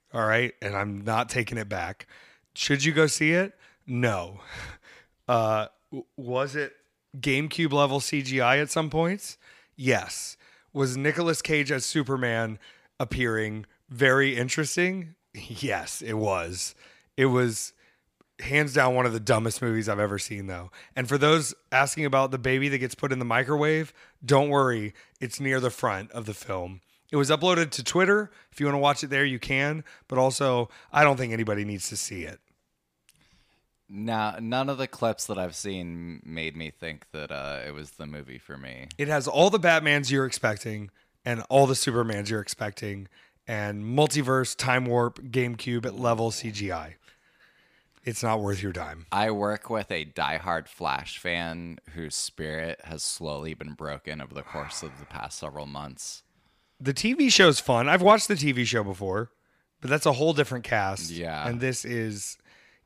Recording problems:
none

